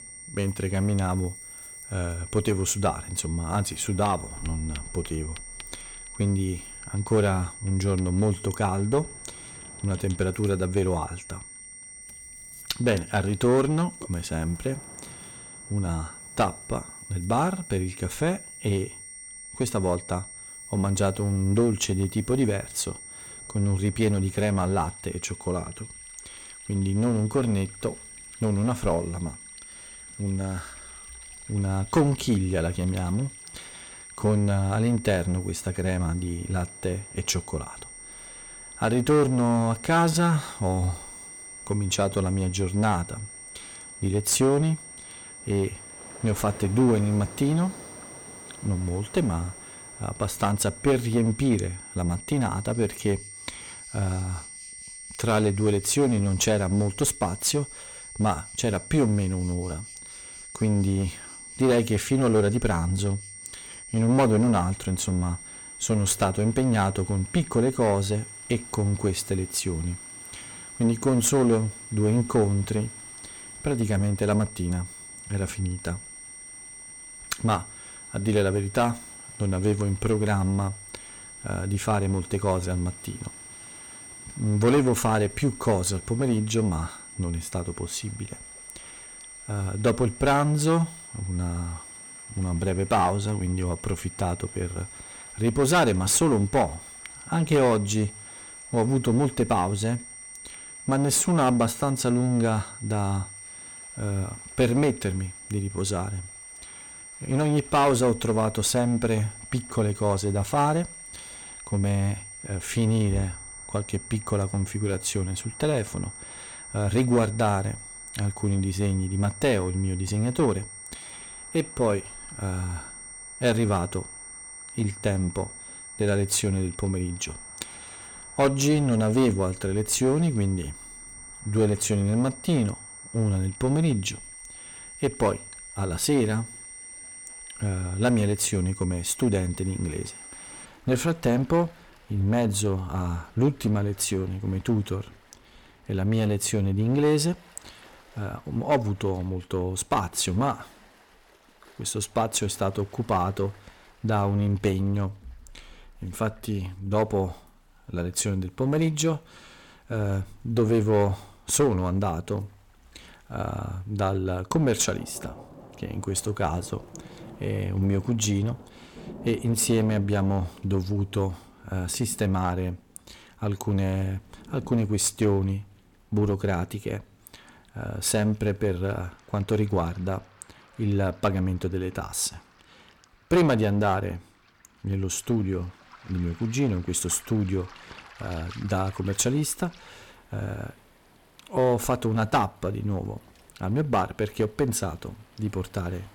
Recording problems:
distortion; slight; 5% of the sound clipped
high-pitched whine; noticeable; until 2:21; 8.5 kHz, 15 dB below the speech
rain or running water; faint; throughout; 25 dB below the speech

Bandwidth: 17.5 kHz